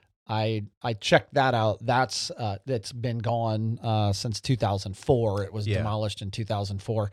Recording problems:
none

